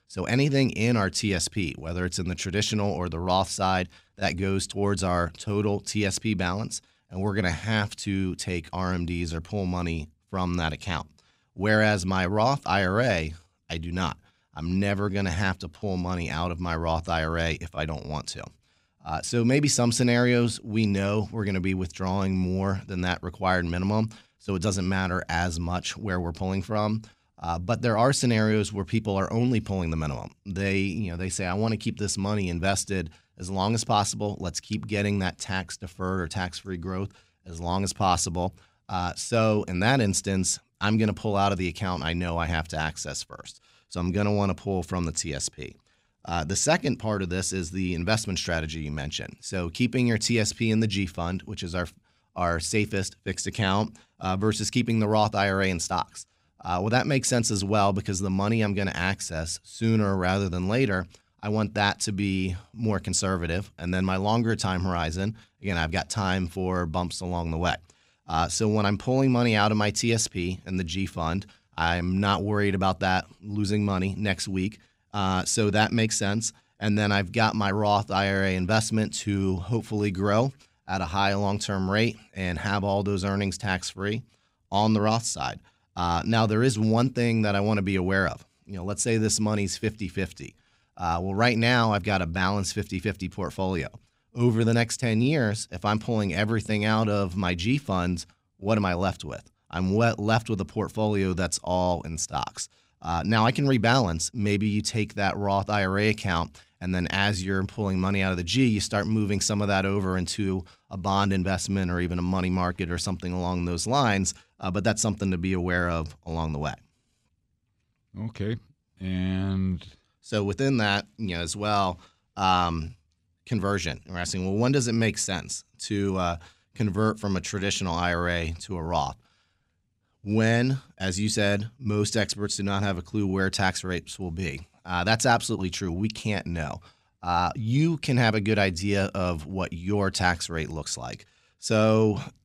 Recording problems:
none

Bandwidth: 15.5 kHz